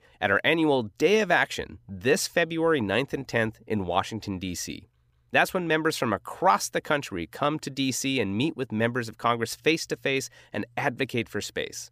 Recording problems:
none

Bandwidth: 15 kHz